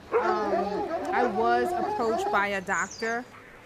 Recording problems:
animal sounds; loud; throughout; 1 dB below the speech
murmuring crowd; noticeable; throughout; 20 dB below the speech
machinery noise; faint; throughout; 20 dB below the speech
hiss; faint; throughout; 30 dB below the speech

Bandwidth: 14.5 kHz